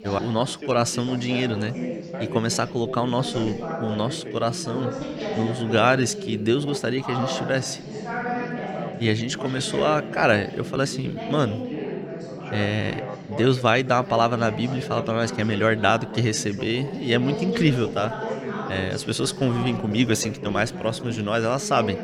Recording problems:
background chatter; loud; throughout; 3 voices, 8 dB below the speech

